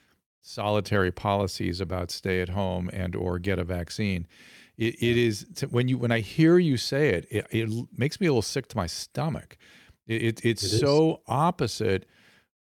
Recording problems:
none

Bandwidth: 18 kHz